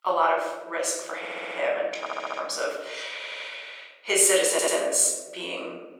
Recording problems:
off-mic speech; far
thin; very; fading below 450 Hz
room echo; noticeable; dies away in 1.2 s
audio stuttering; 4 times, first at 1 s

